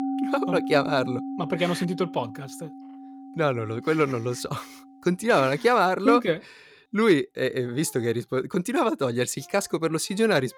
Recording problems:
background music; noticeable; throughout; 10 dB below the speech

